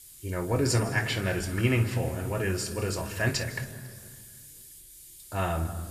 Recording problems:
room echo; slight; dies away in 1.8 s
off-mic speech; somewhat distant
hiss; noticeable; throughout; 15 dB below the speech

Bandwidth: 14.5 kHz